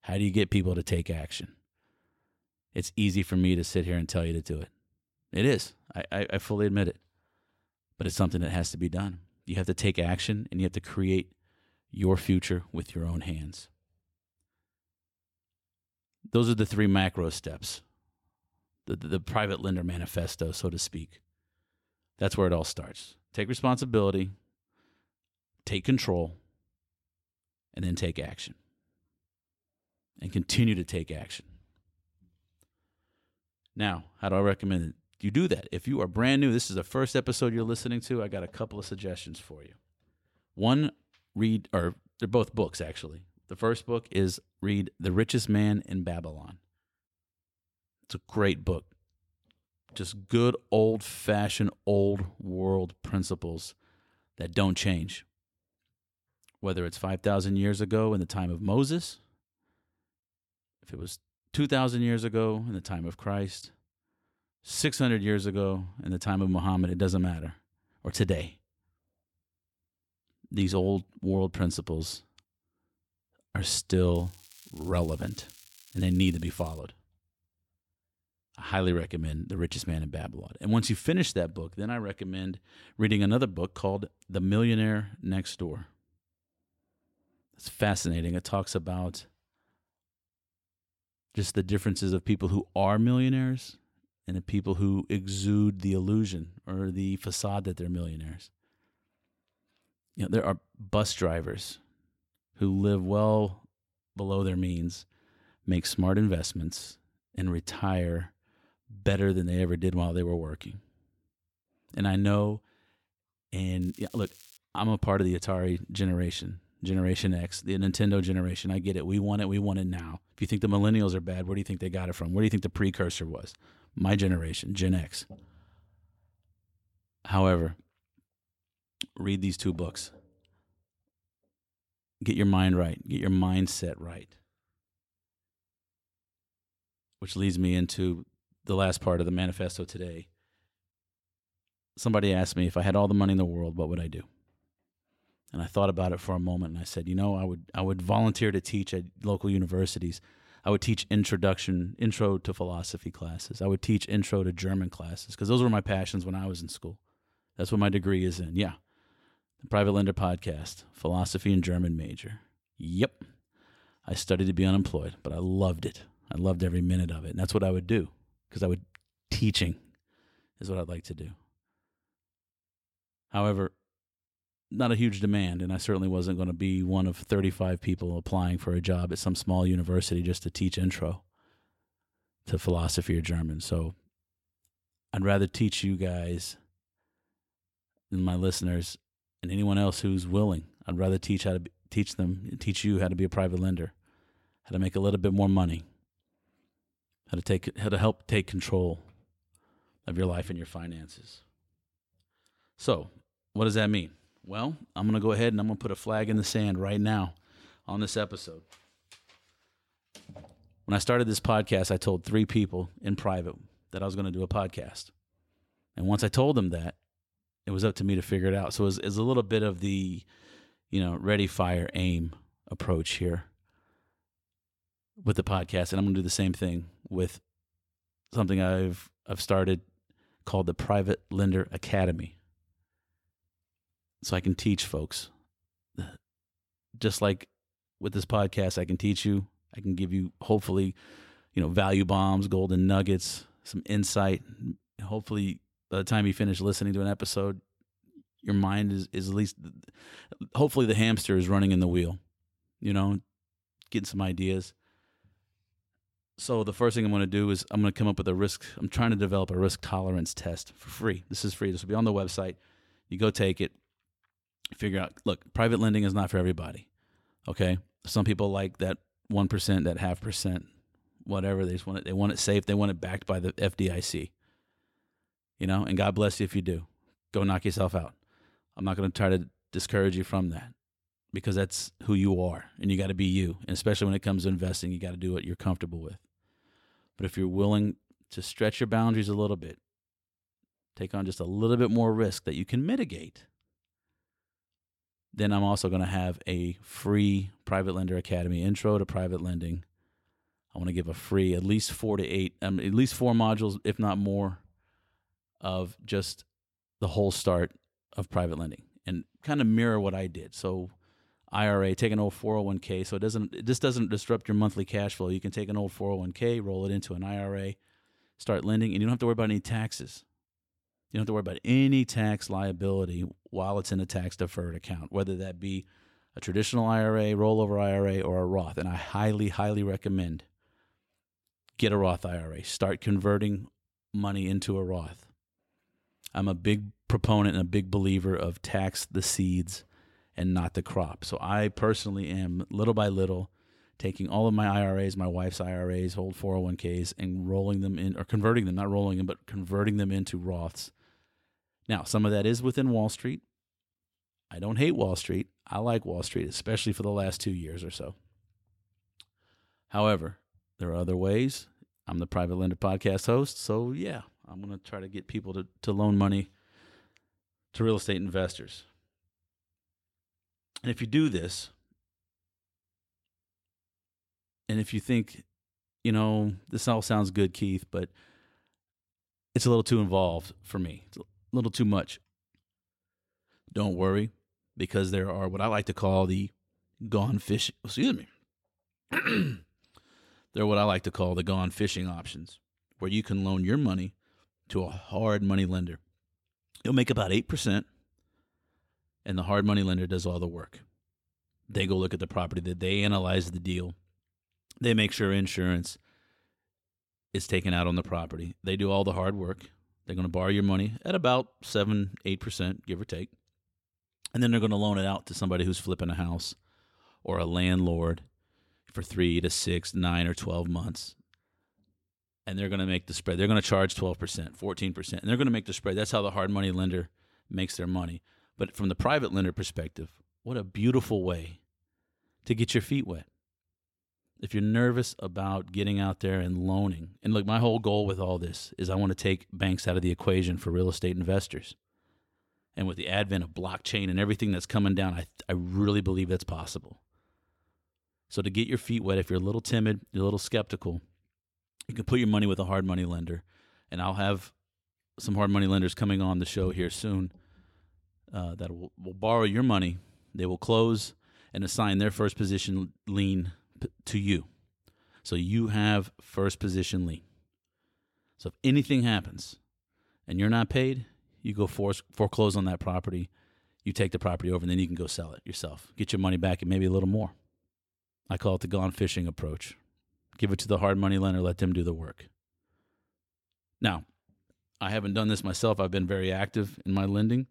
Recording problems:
crackling; faint; from 1:14 to 1:17 and at 1:54; 25 dB below the speech

